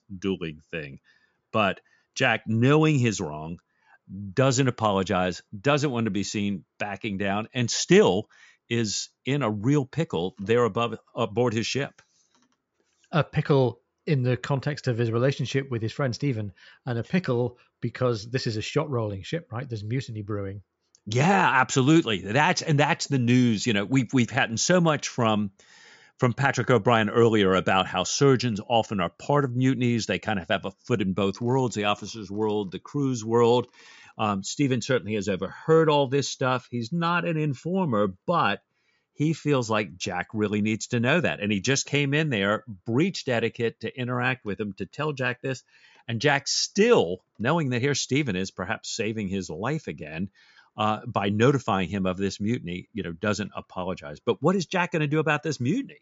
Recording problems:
high frequencies cut off; noticeable; nothing above 7.5 kHz

